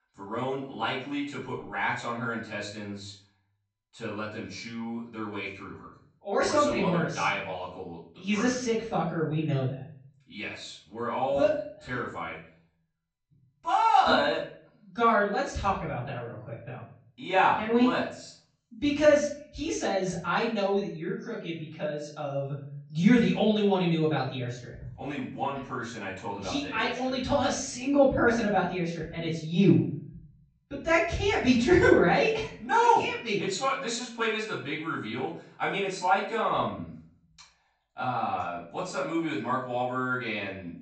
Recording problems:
off-mic speech; far
room echo; noticeable; dies away in 0.5 s
high frequencies cut off; noticeable; nothing above 8 kHz

